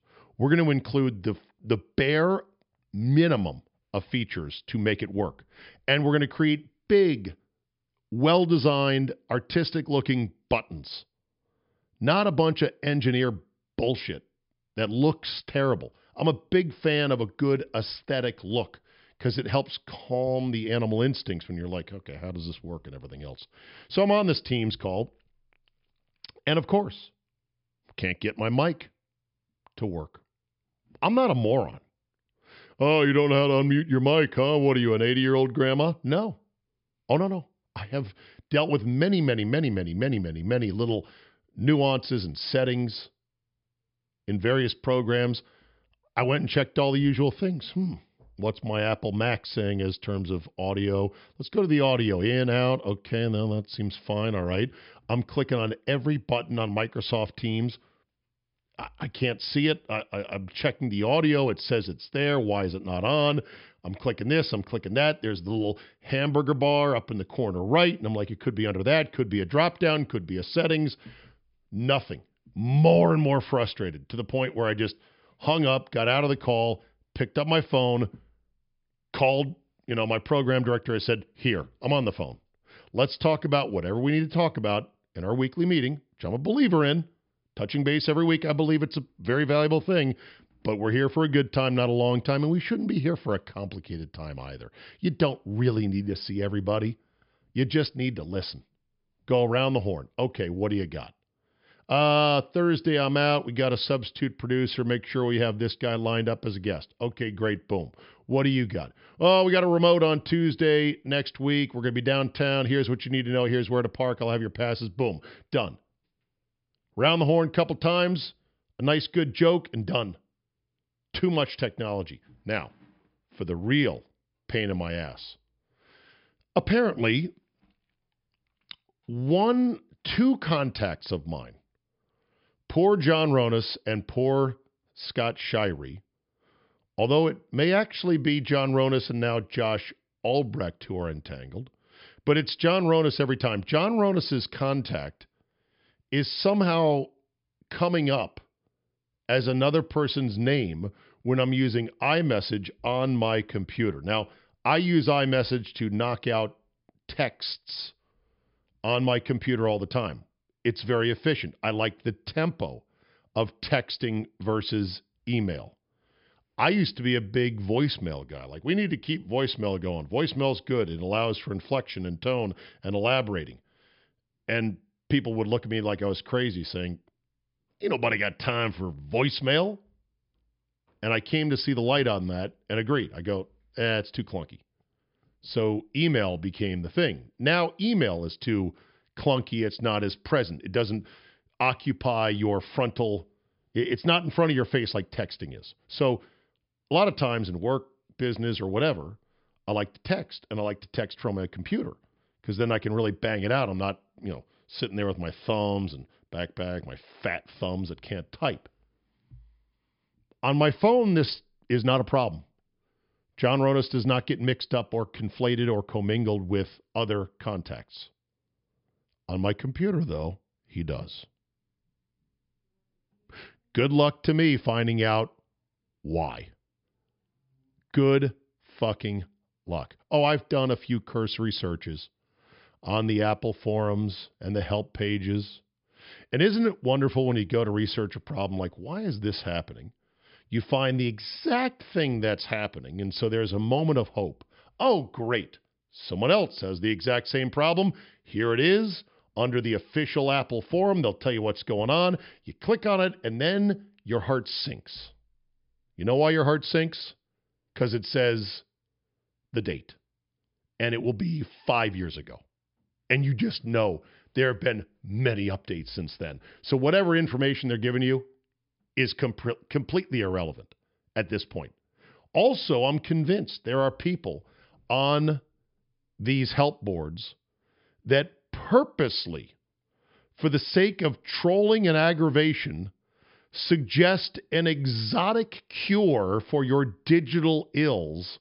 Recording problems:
high frequencies cut off; noticeable; nothing above 5.5 kHz

